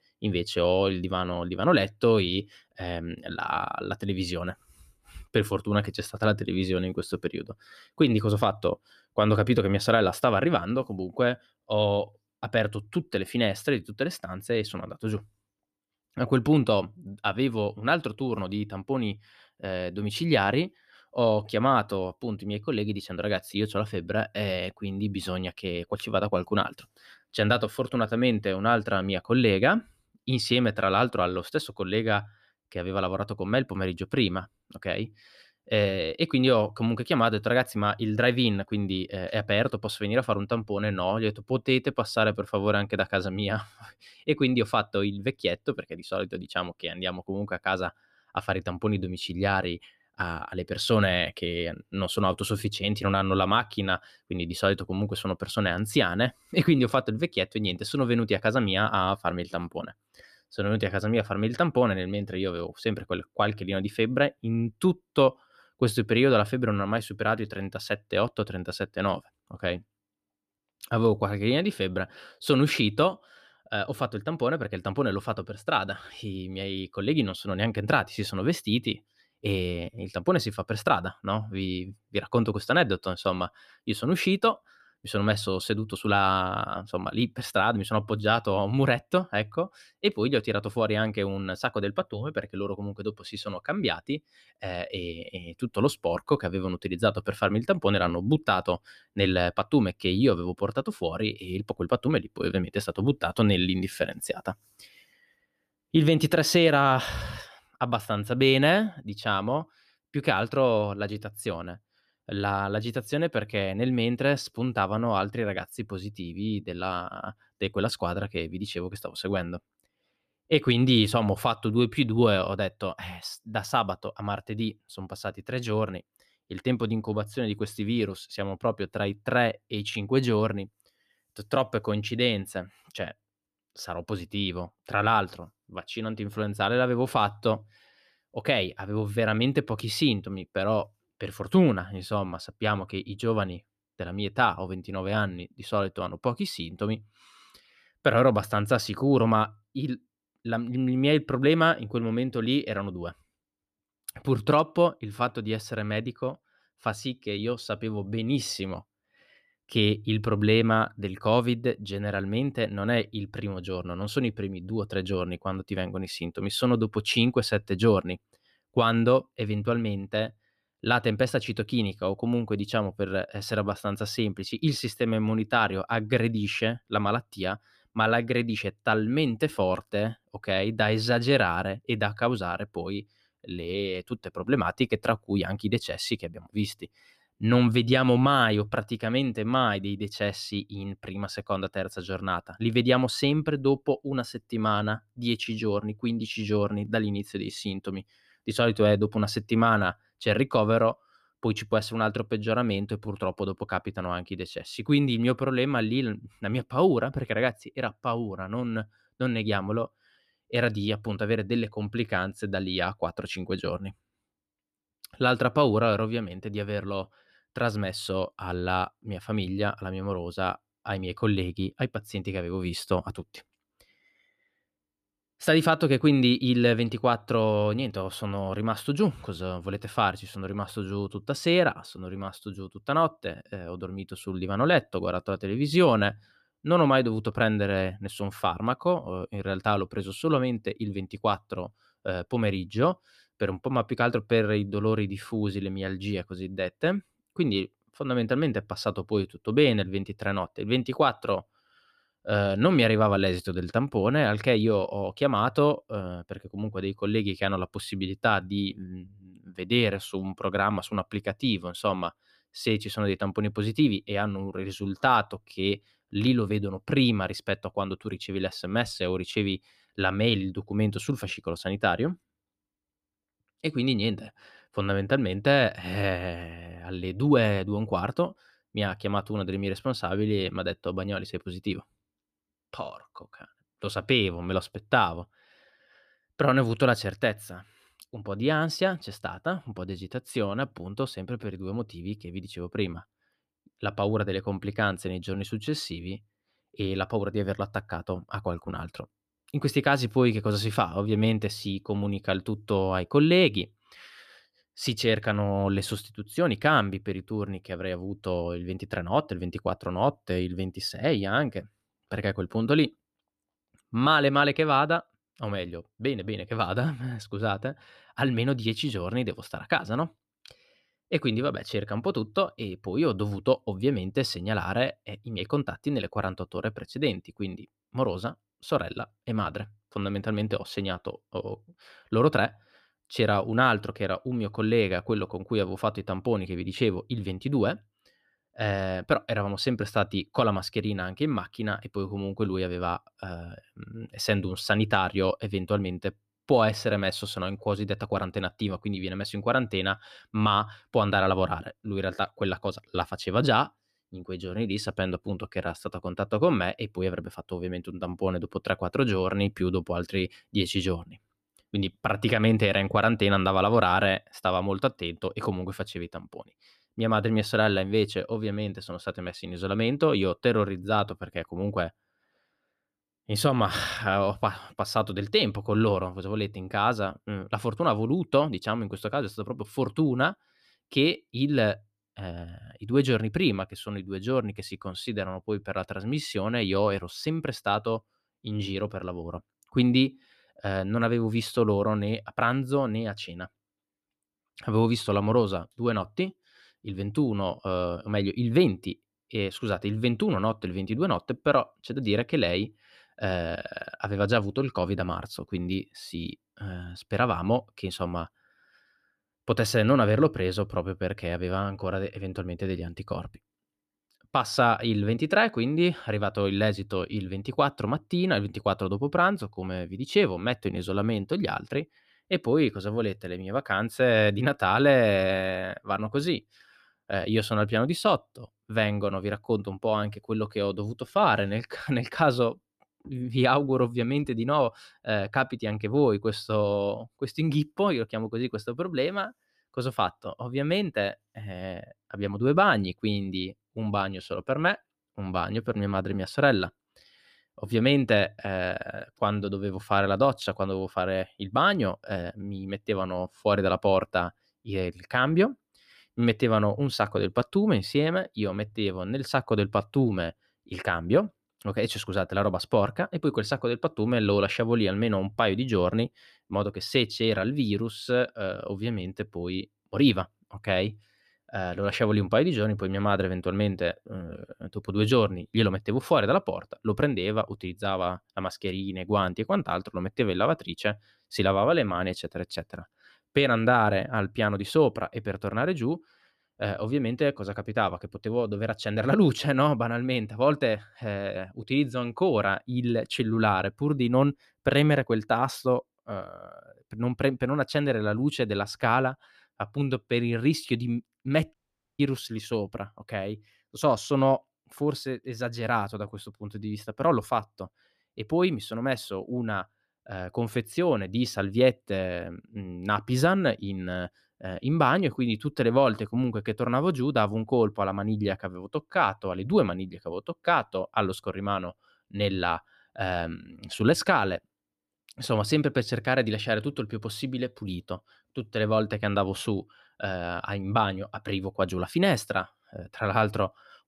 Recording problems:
audio cutting out; at 8:22

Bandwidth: 14.5 kHz